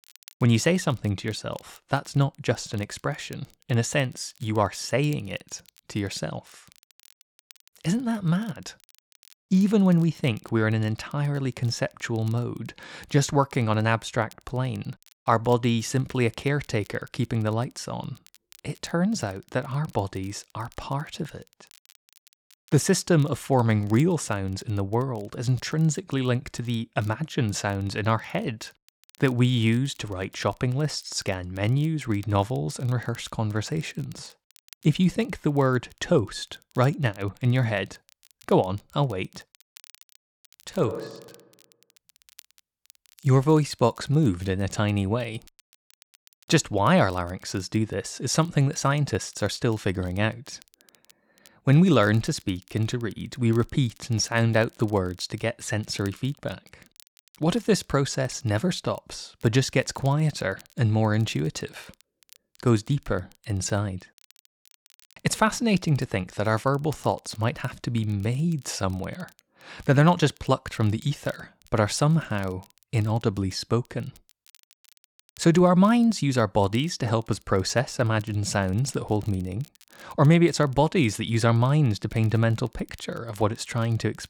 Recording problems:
crackle, like an old record; faint; 30 dB below the speech

